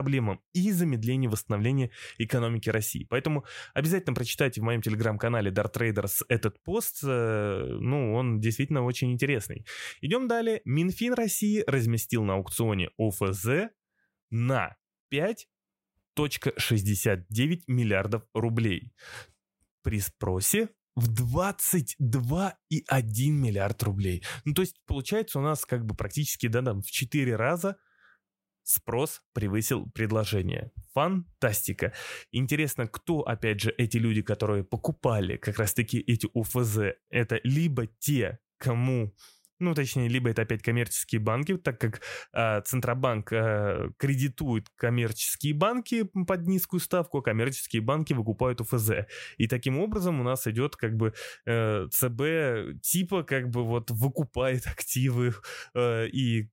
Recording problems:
abrupt cut into speech; at the start

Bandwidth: 16 kHz